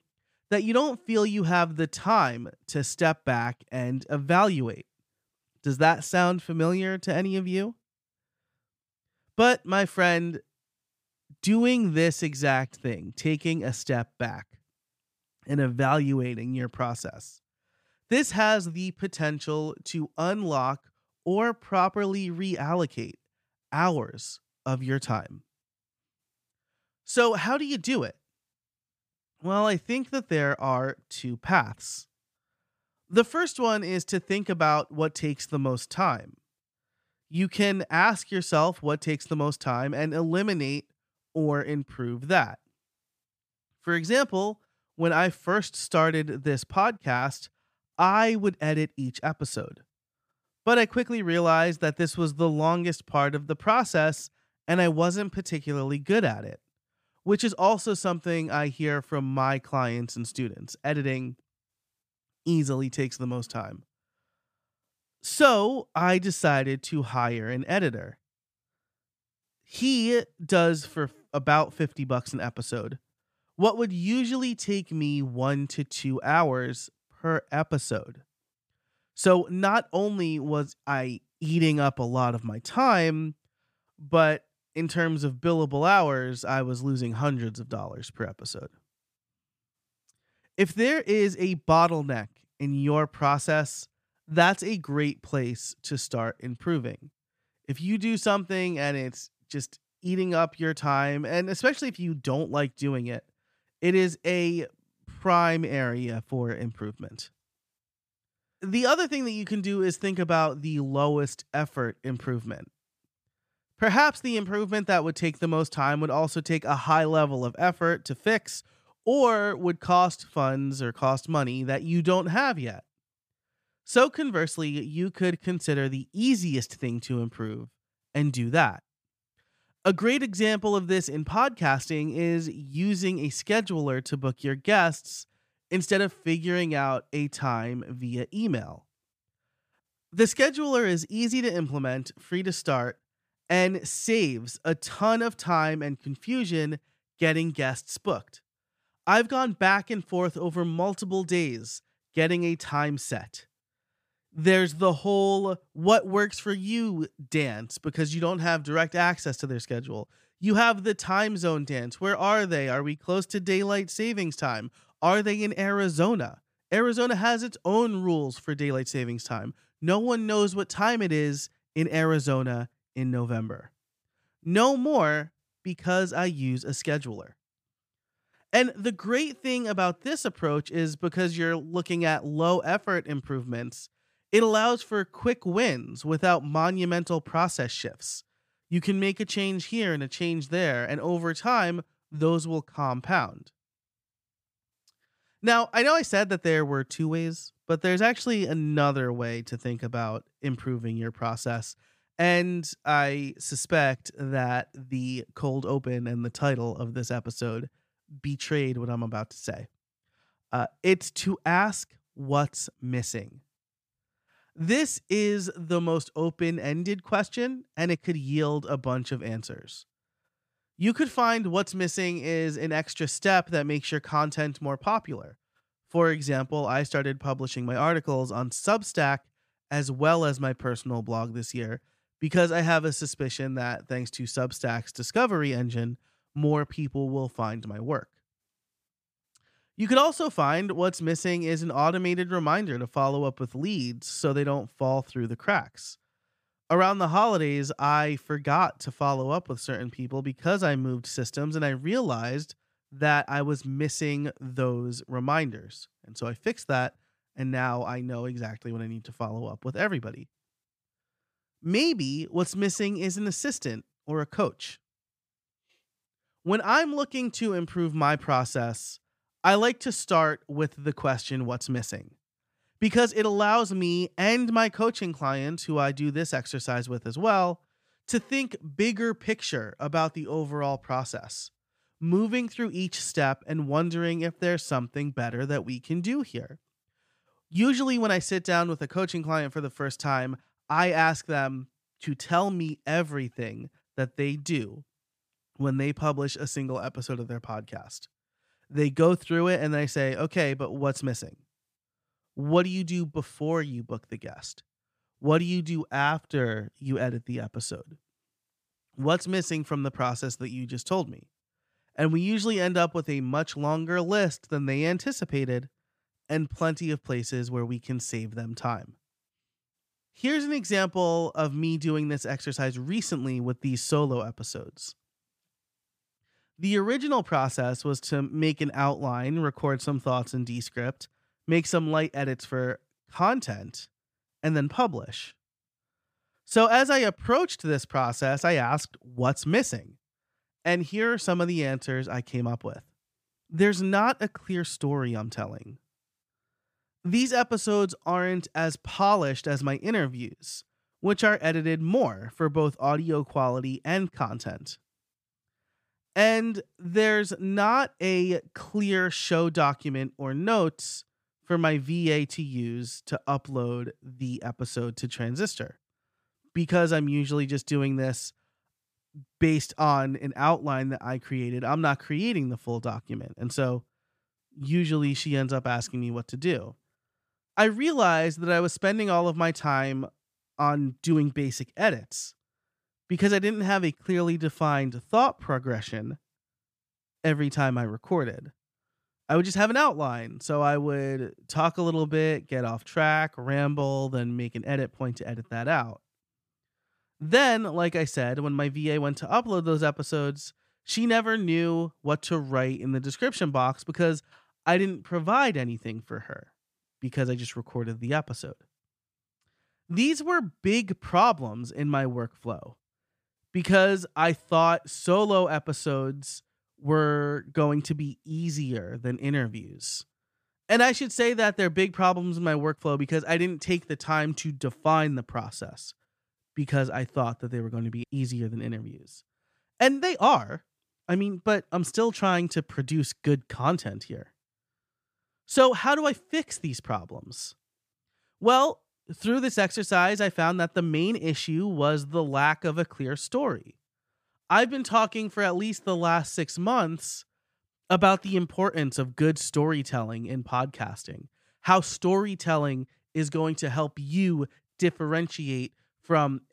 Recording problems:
none

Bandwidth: 15 kHz